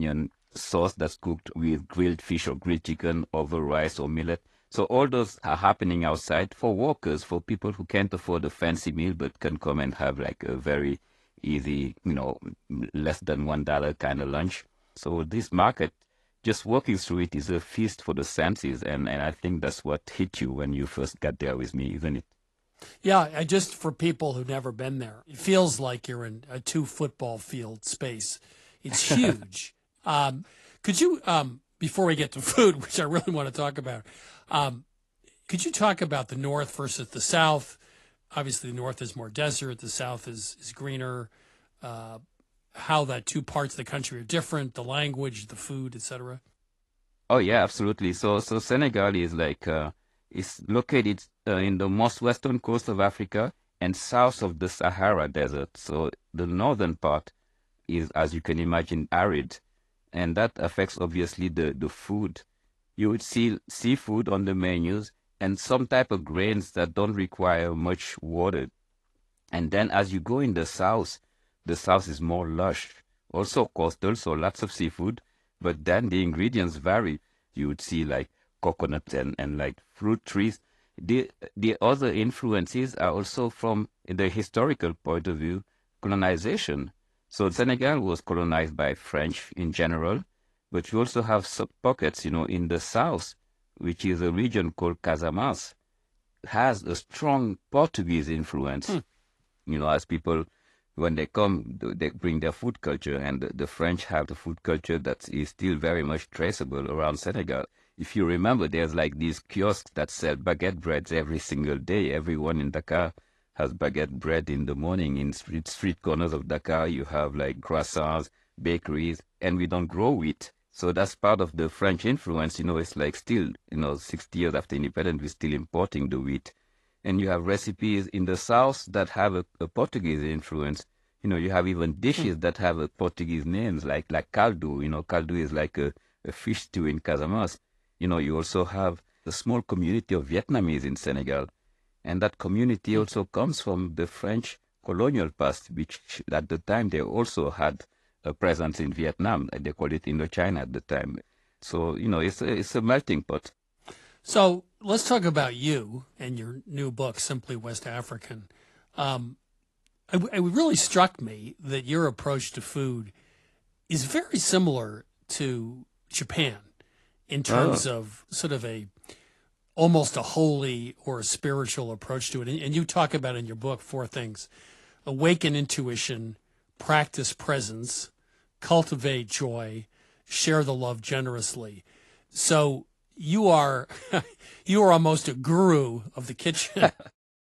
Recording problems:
garbled, watery; slightly; nothing above 11.5 kHz
abrupt cut into speech; at the start

